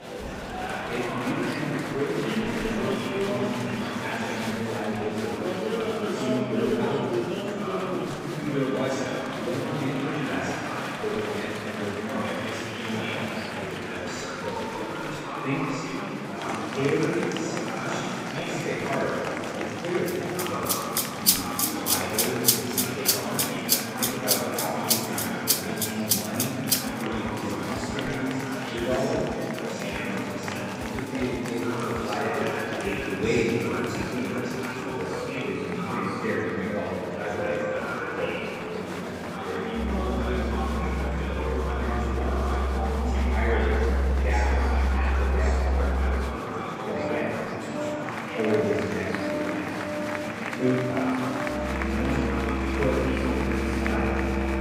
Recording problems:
room echo; strong; dies away in 2.7 s
off-mic speech; far
background music; very loud; from 21 s on; 3 dB above the speech
murmuring crowd; loud; throughout; as loud as the speech

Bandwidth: 15.5 kHz